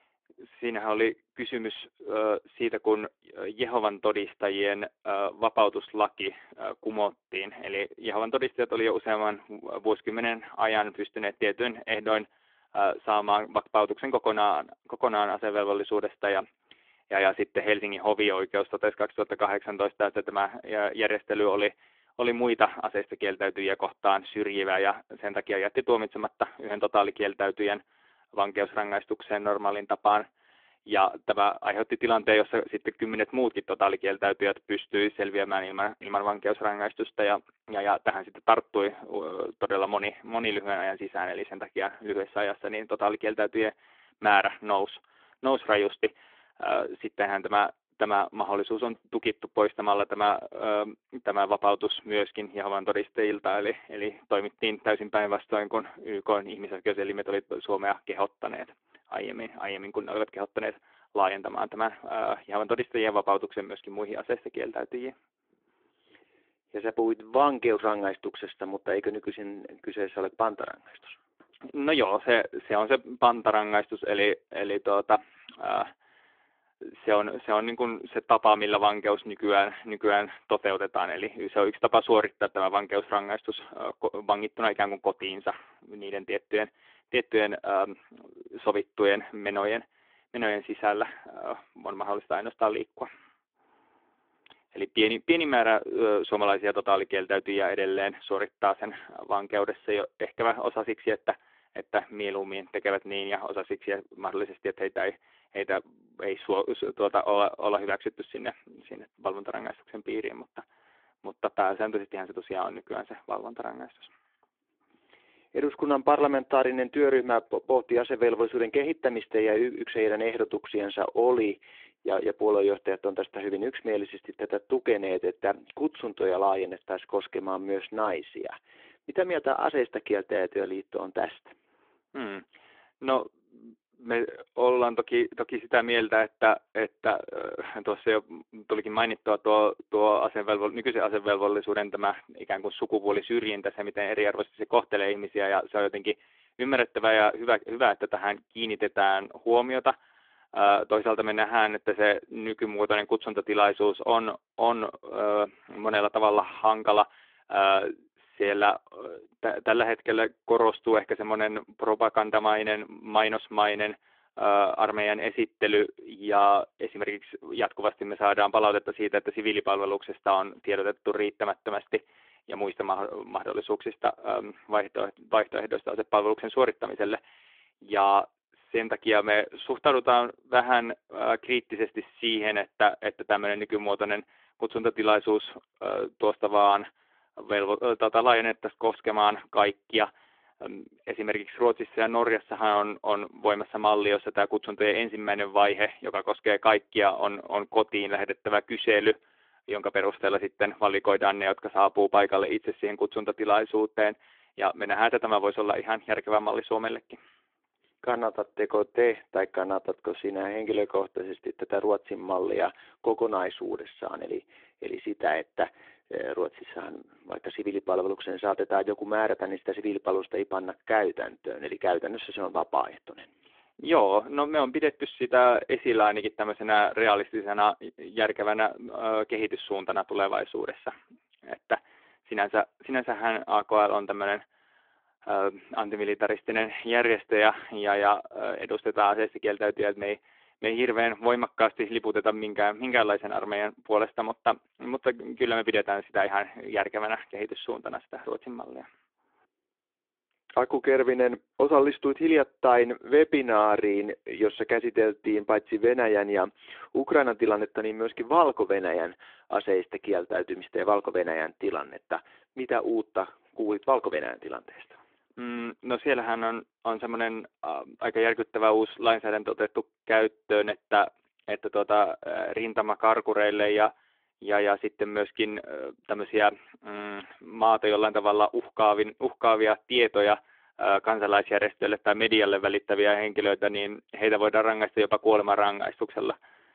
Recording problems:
phone-call audio; nothing above 3.5 kHz

